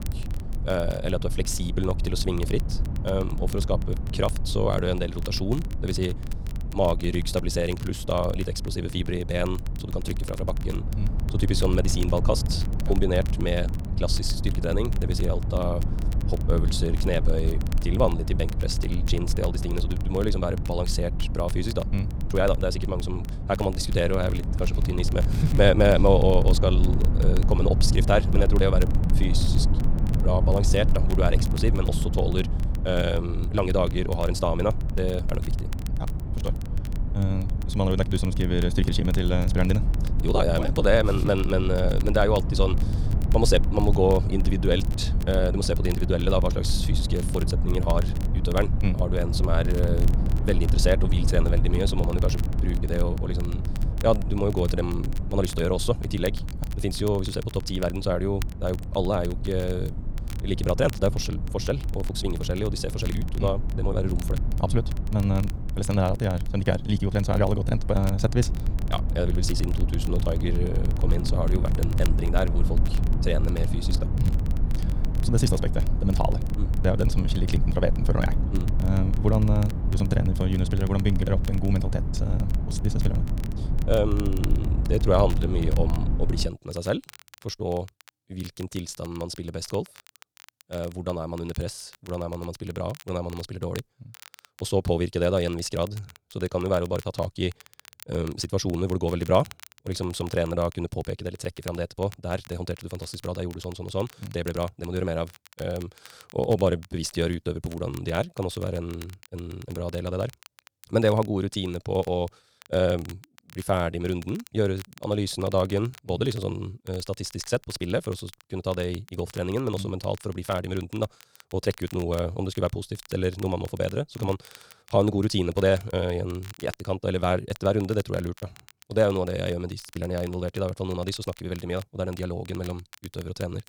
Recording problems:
wrong speed, natural pitch; too fast; 1.5 times normal speed
low rumble; noticeable; until 1:26; 10 dB below the speech
crackle, like an old record; faint; 20 dB below the speech

